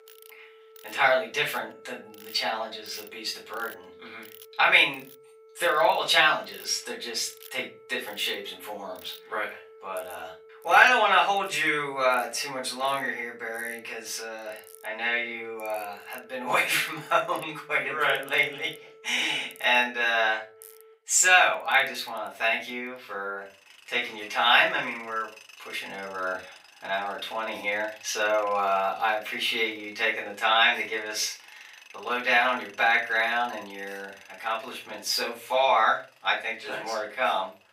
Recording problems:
off-mic speech; far
thin; very; fading below 700 Hz
room echo; slight; dies away in 0.3 s
alarms or sirens; faint; throughout; 25 dB below the speech
machinery noise; faint; throughout; 25 dB below the speech

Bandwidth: 15.5 kHz